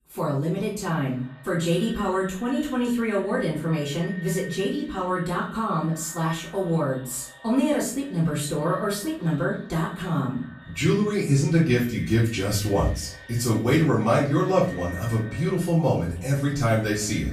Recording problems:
off-mic speech; far
echo of what is said; faint; throughout; 290 ms later, 20 dB below the speech
room echo; slight; dies away in 0.4 s

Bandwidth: 15 kHz